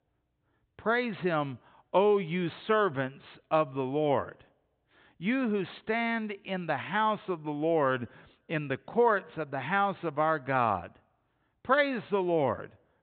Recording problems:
high frequencies cut off; severe; nothing above 4 kHz

